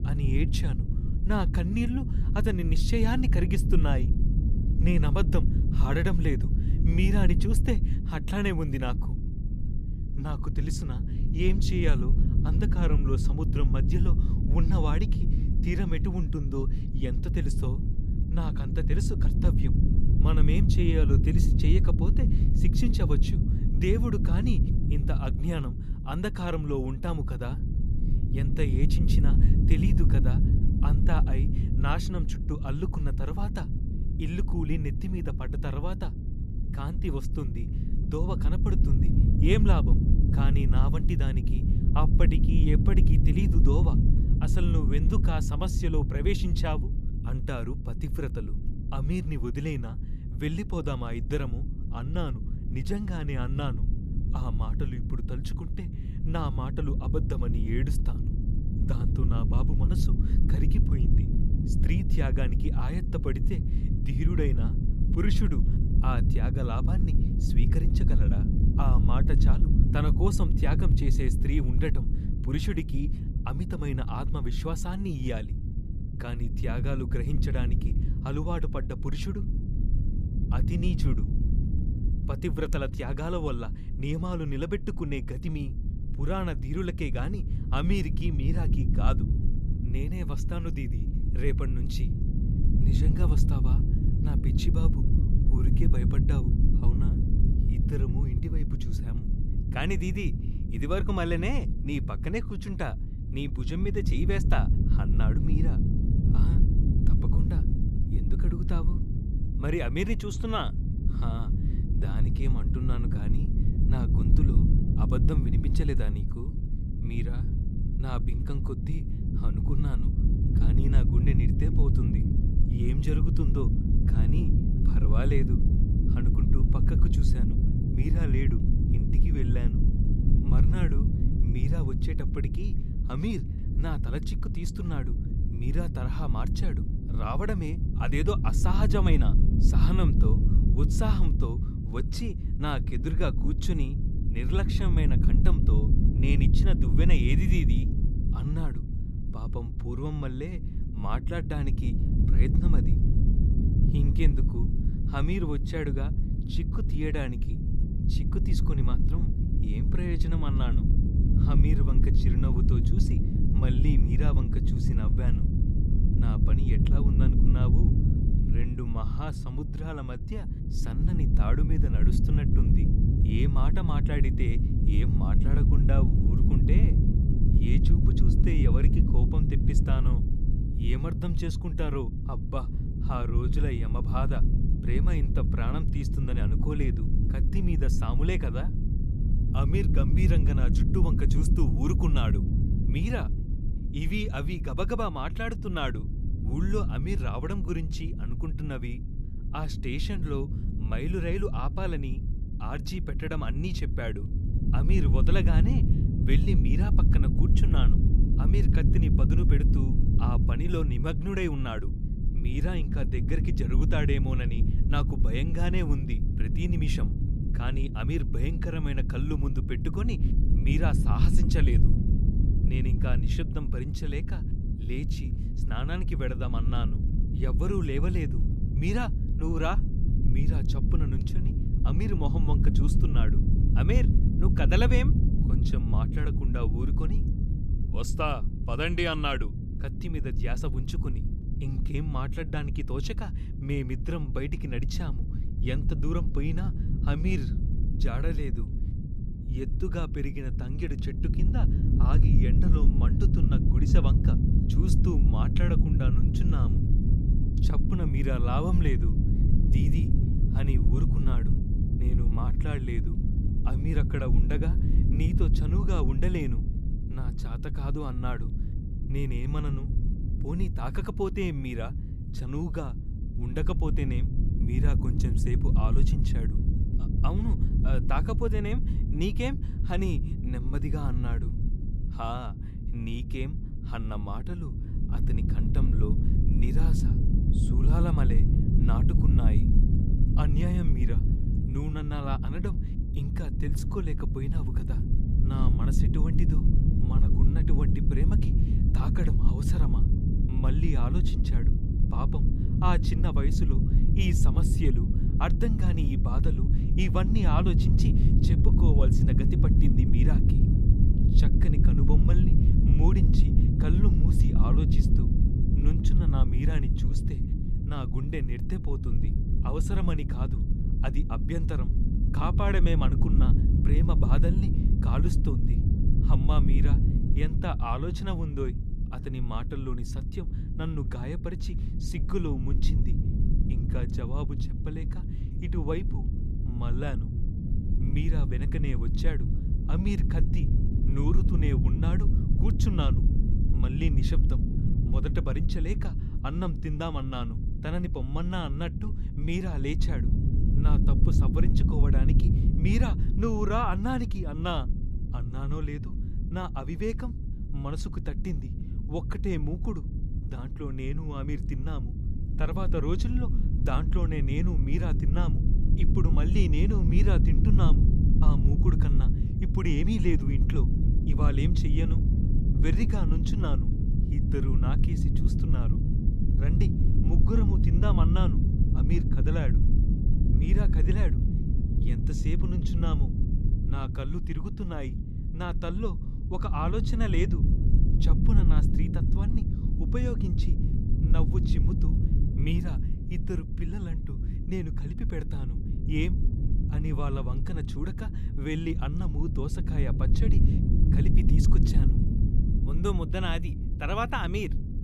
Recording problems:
low rumble; loud; throughout; 3 dB below the speech

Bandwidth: 15 kHz